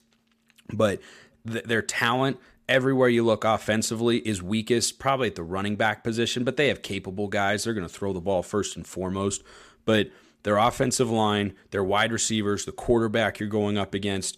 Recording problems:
none

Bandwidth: 14.5 kHz